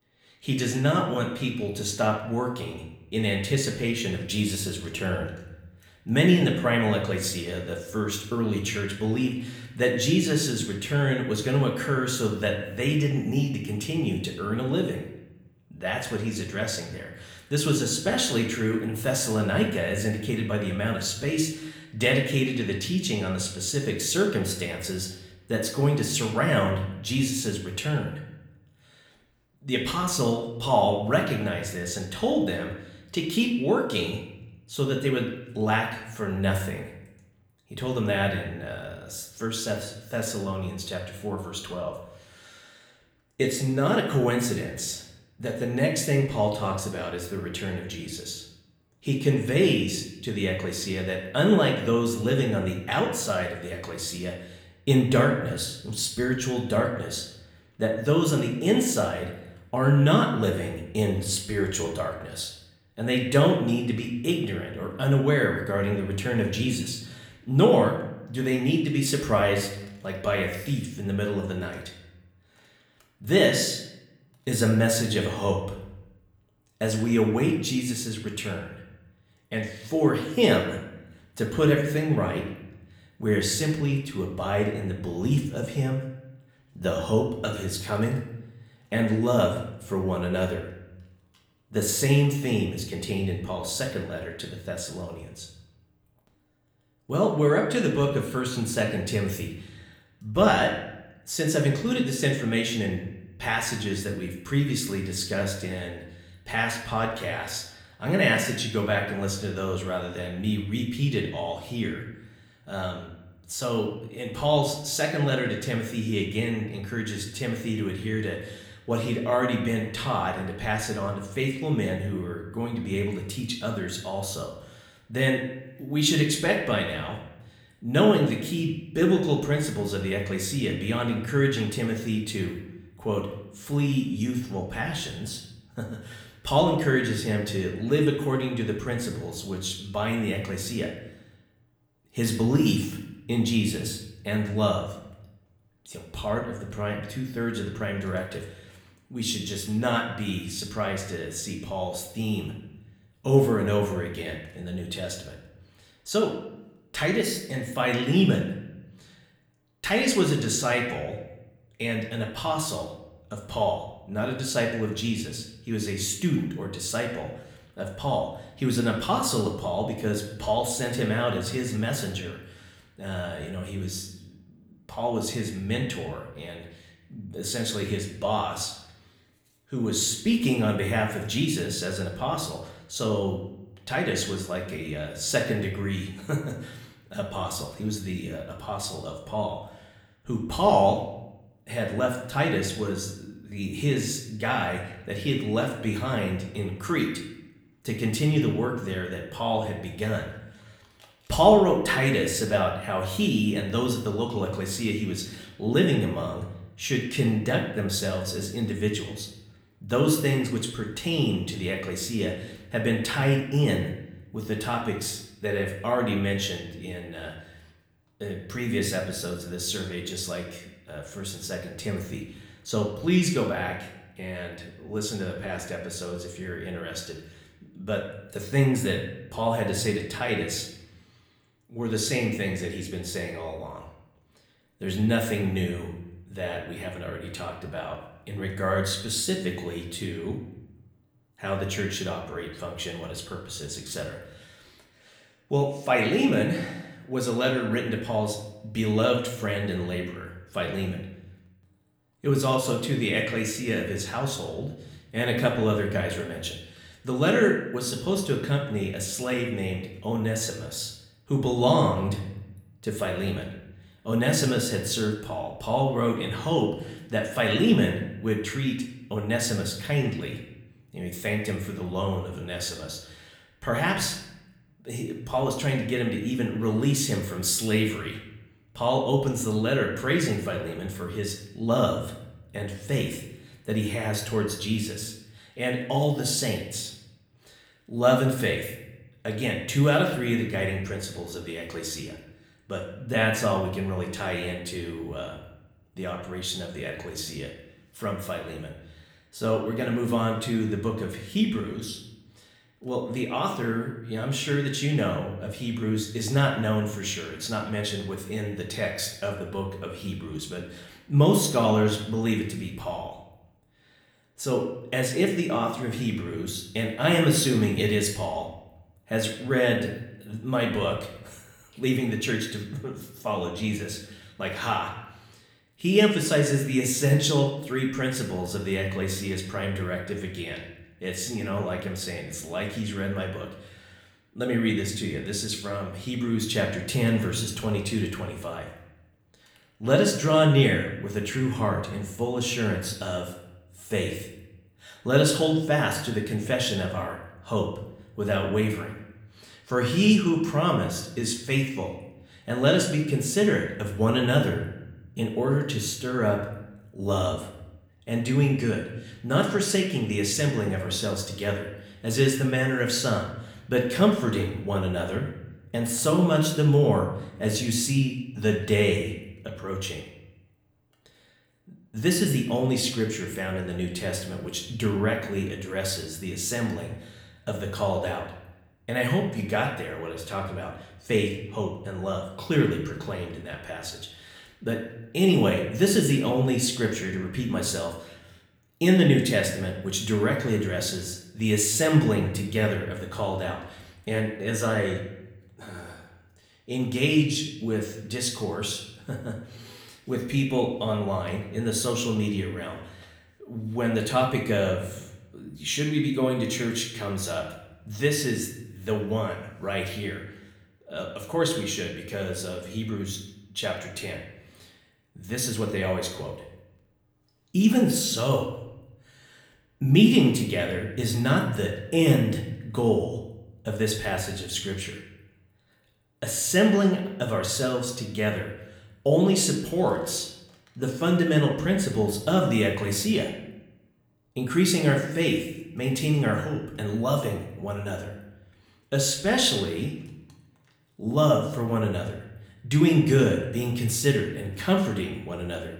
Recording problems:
room echo; slight; dies away in 0.7 s
off-mic speech; somewhat distant

